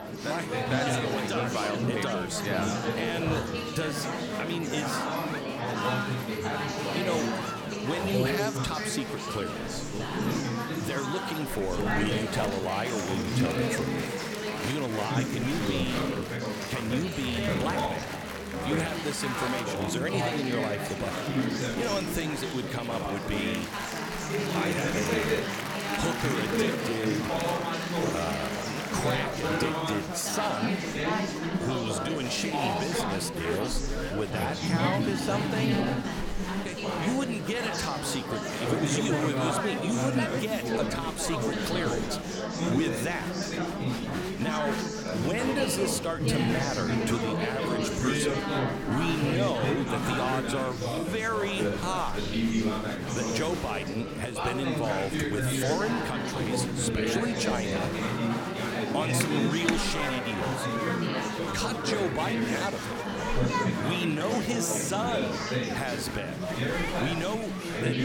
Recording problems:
chatter from many people; very loud; throughout; 2 dB above the speech

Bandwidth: 17 kHz